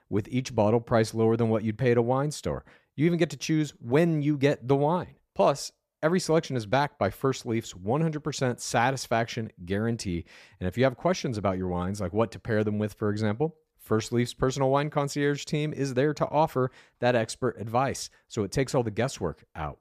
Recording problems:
none

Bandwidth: 14.5 kHz